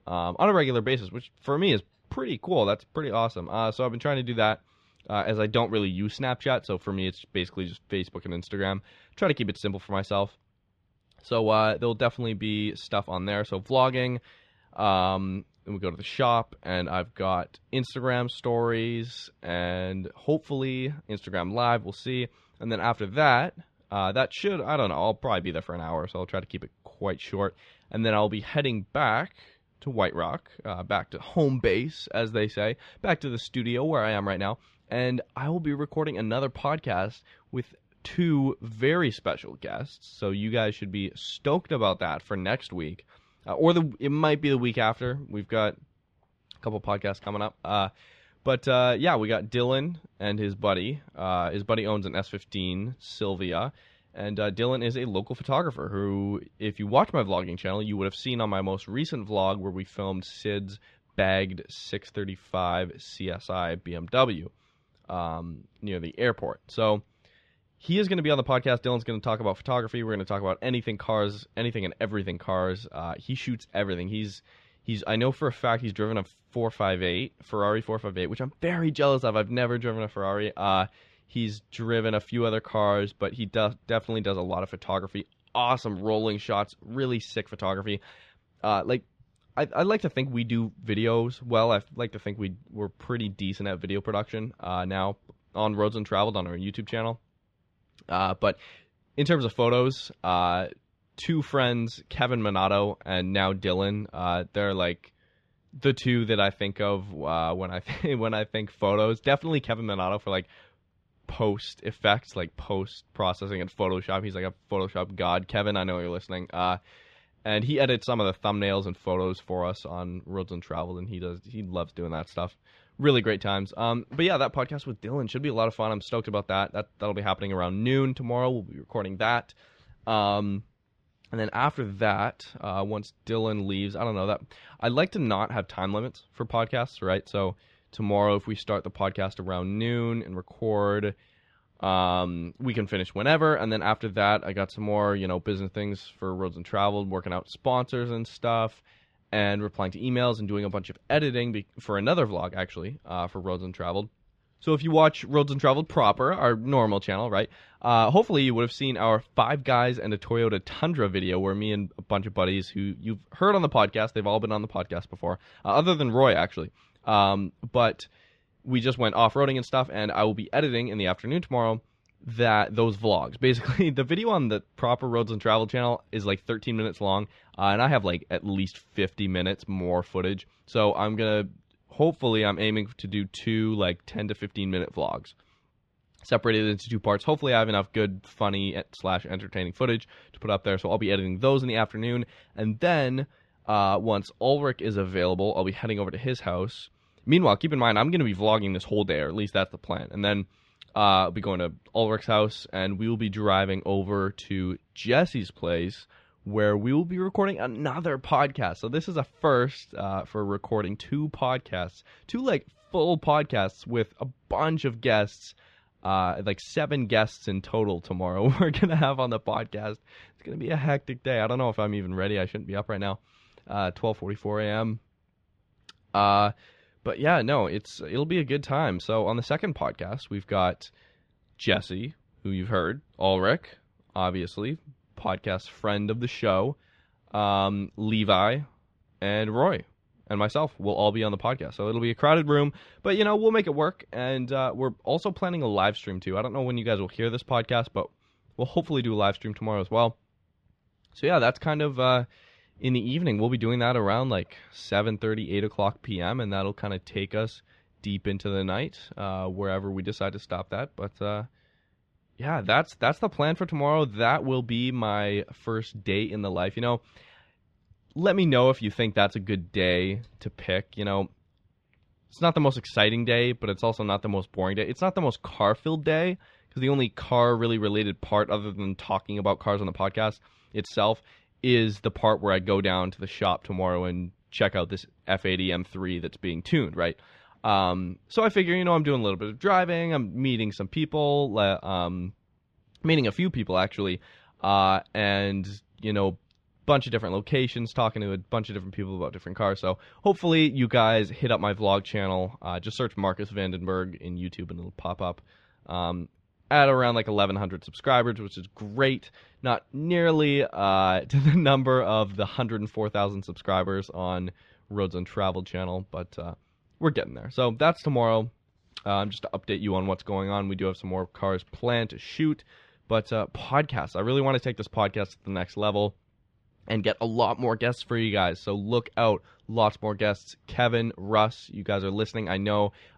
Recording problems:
muffled; very slightly; fading above 4 kHz

